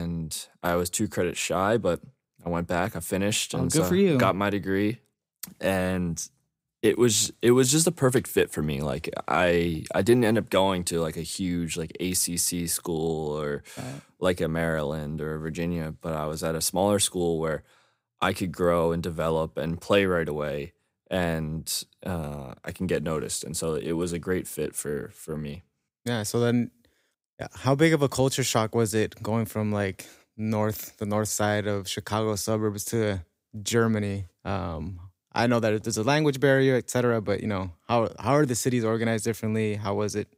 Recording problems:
abrupt cut into speech; at the start

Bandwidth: 15.5 kHz